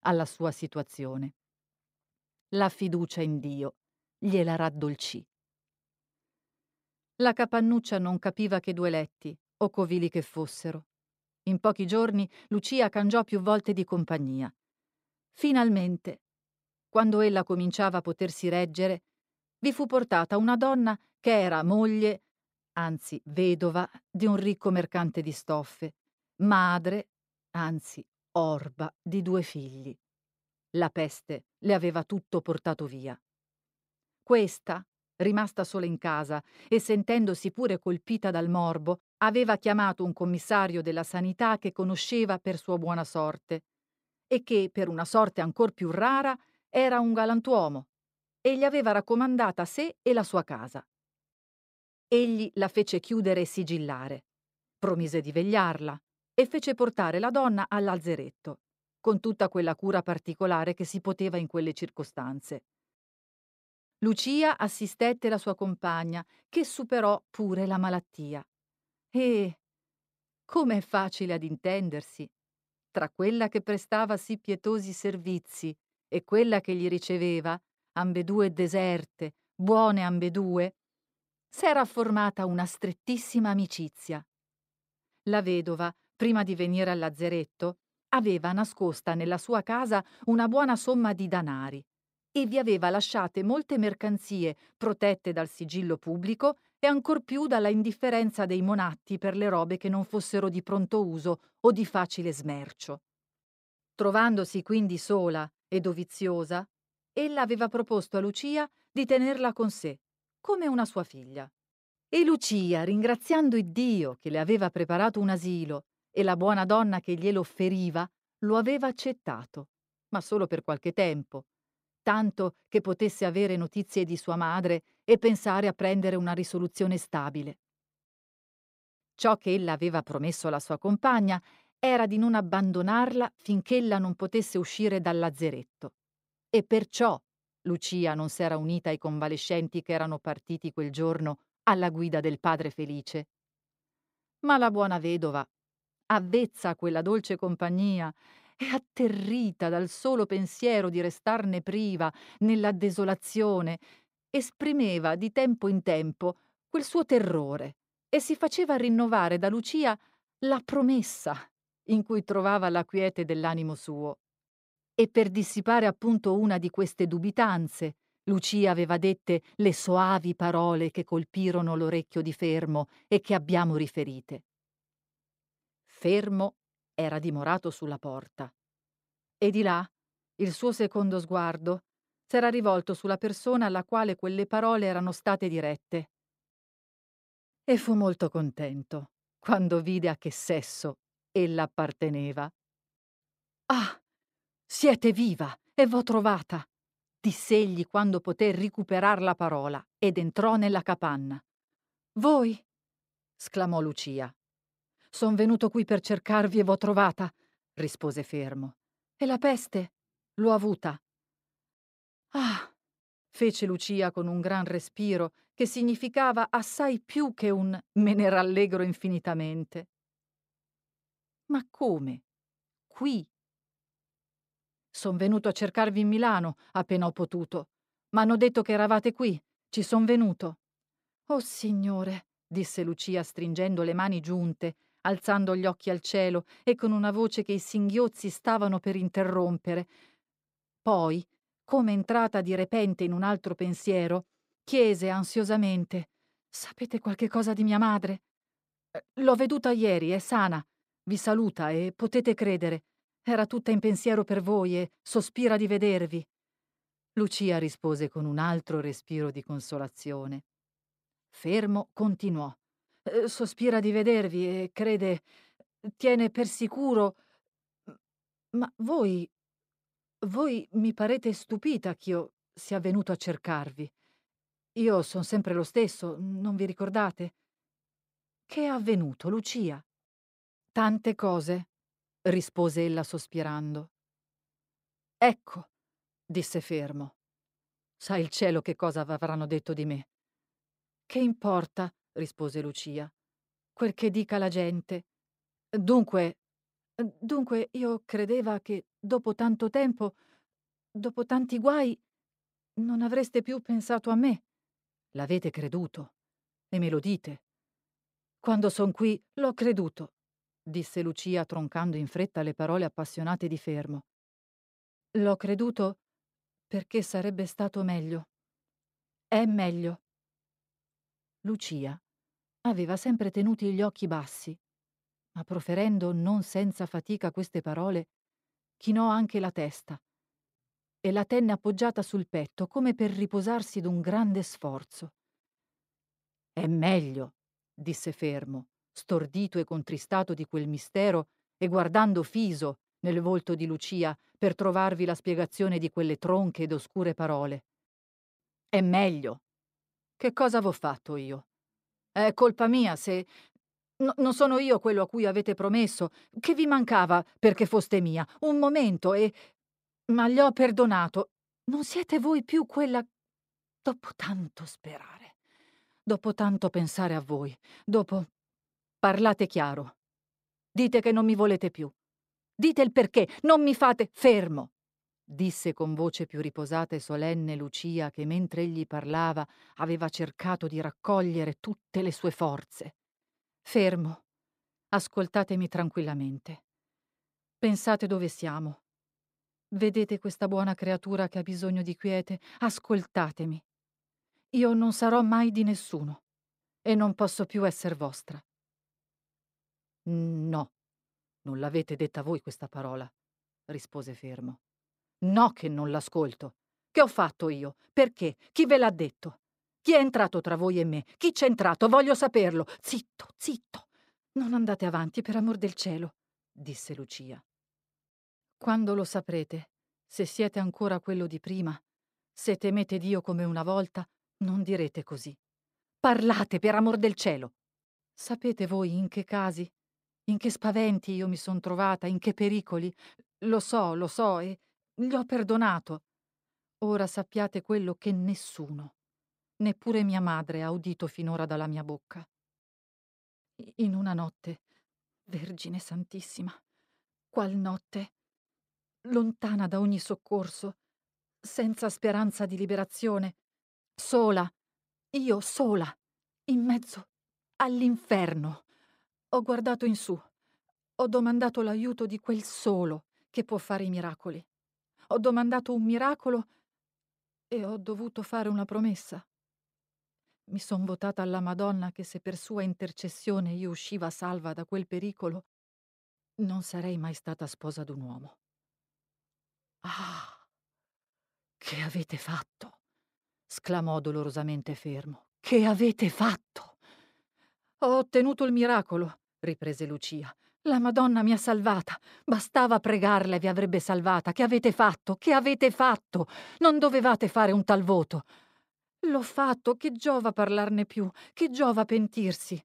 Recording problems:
none

